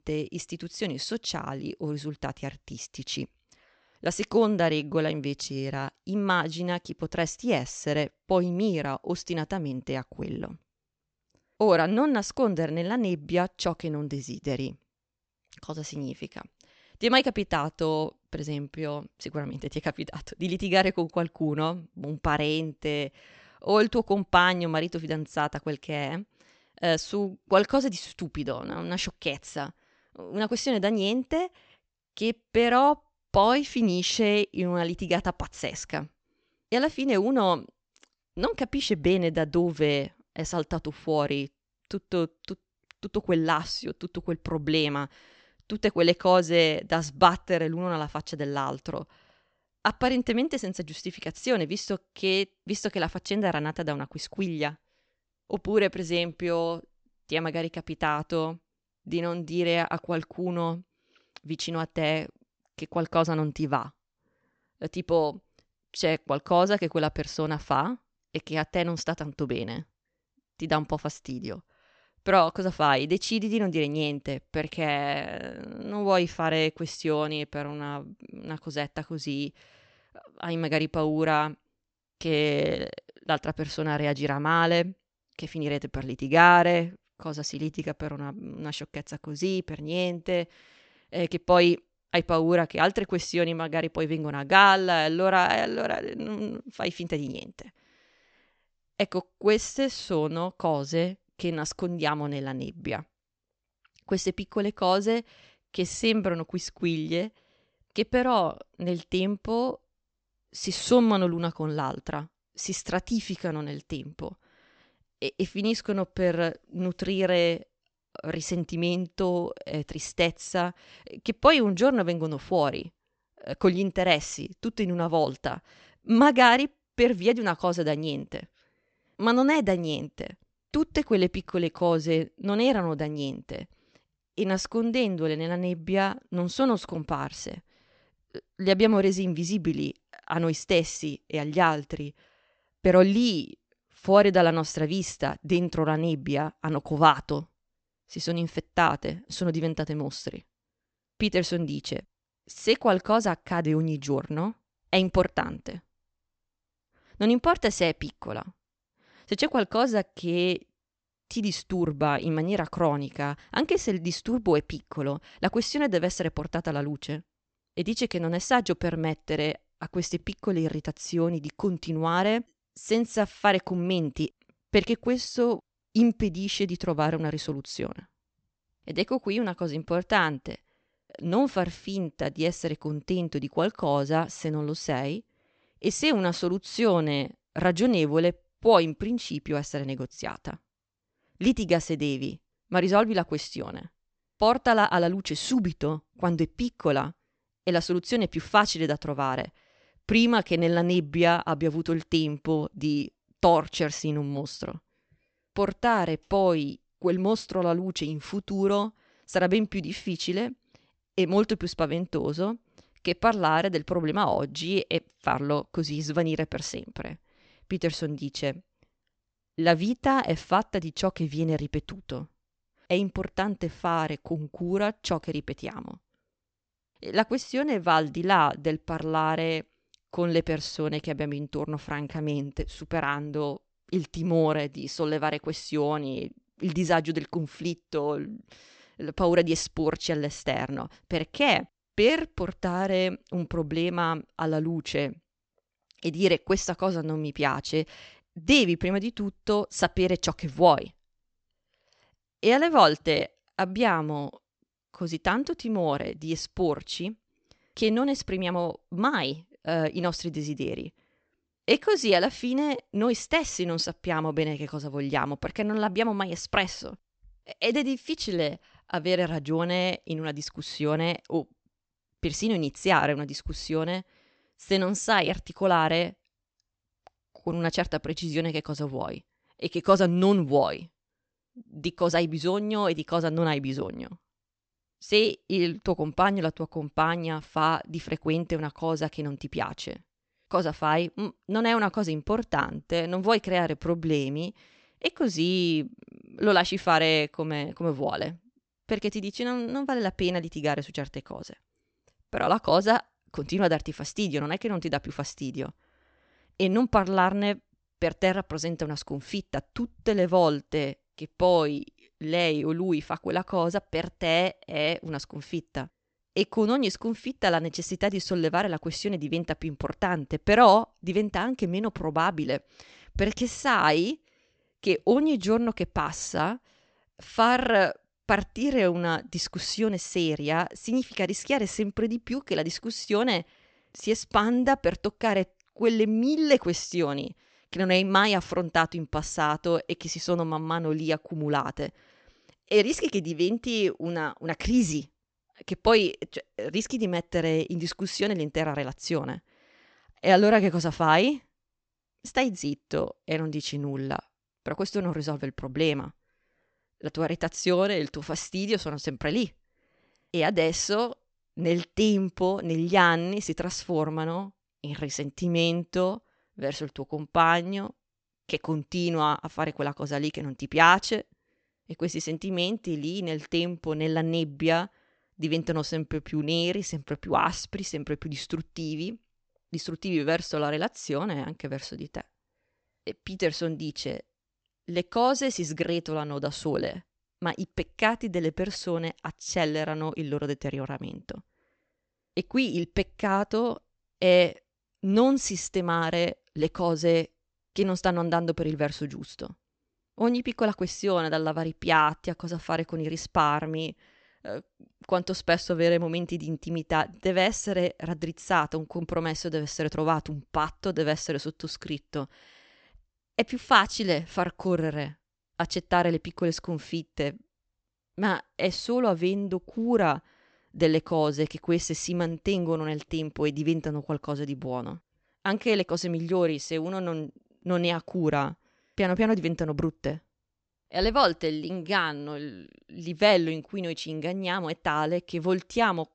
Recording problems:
high frequencies cut off; noticeable; nothing above 8 kHz

